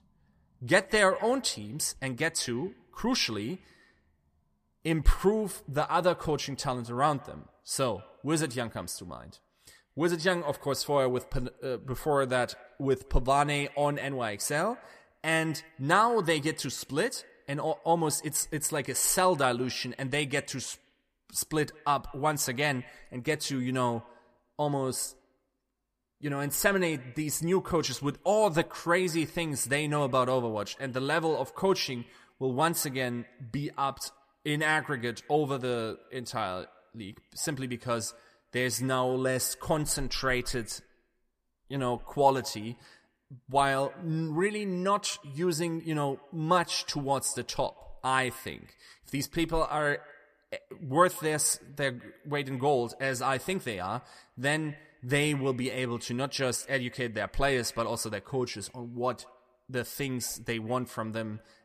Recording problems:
echo of what is said; faint; throughout; 180 ms later, 25 dB below the speech

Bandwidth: 14.5 kHz